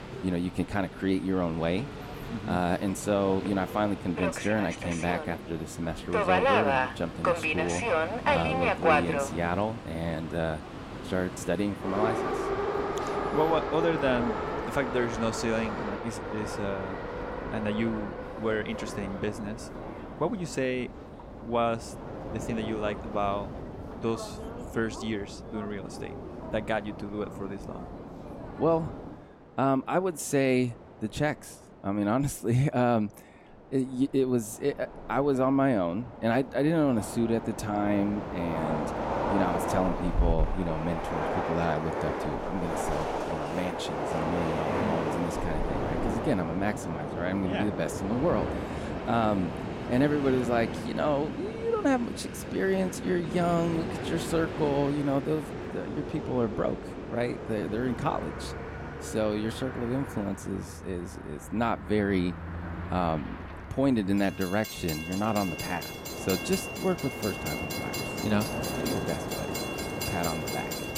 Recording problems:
train or aircraft noise; loud; throughout; 3 dB below the speech

